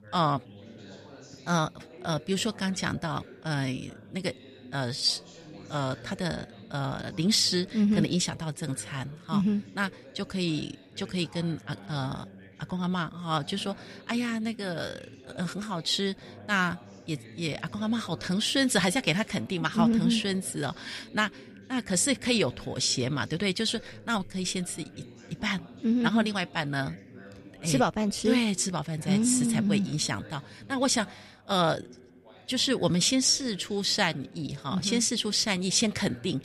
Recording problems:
background chatter; faint; throughout; 3 voices, 20 dB below the speech

